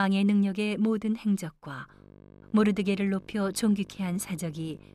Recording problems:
electrical hum; faint; from 2 s on; 50 Hz, 25 dB below the speech
abrupt cut into speech; at the start

